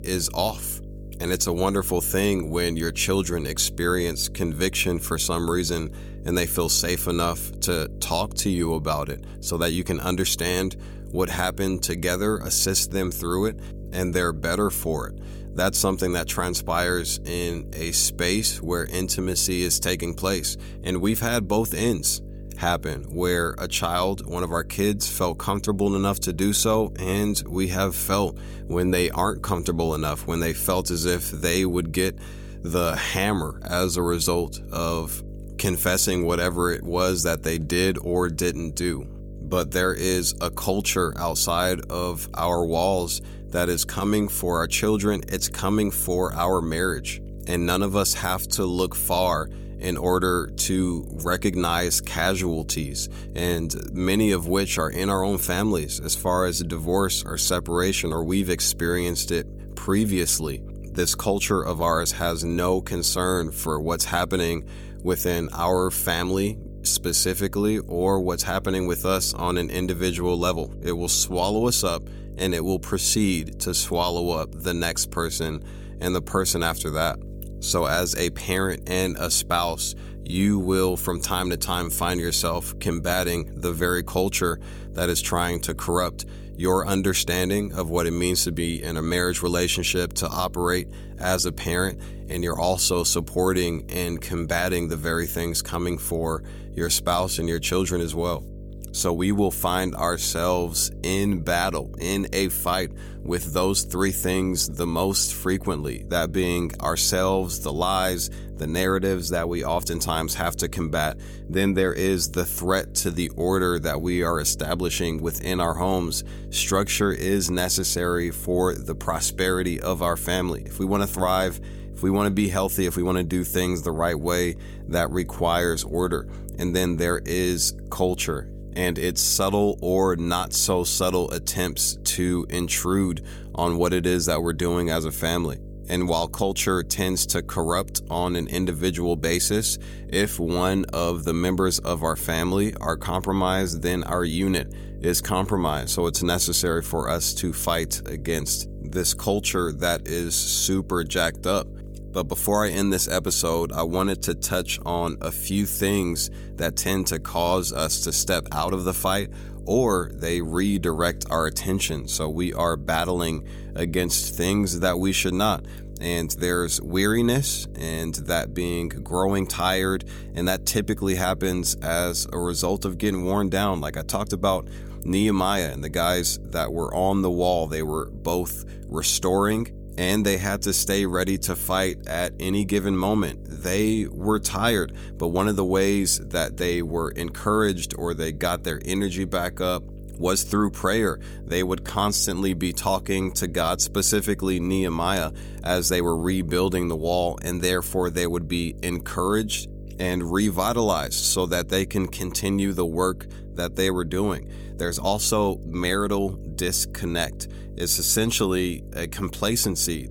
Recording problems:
electrical hum; faint; throughout; 50 Hz, 25 dB below the speech

